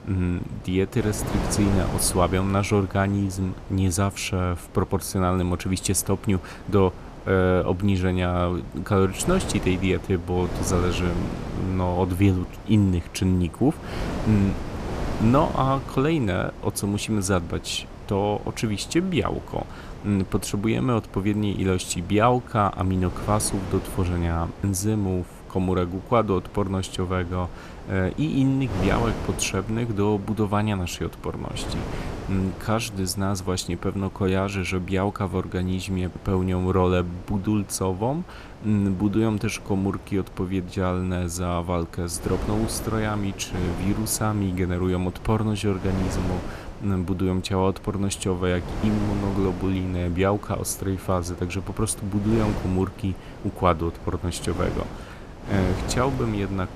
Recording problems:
wind noise on the microphone; occasional gusts; 10 dB below the speech

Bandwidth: 14 kHz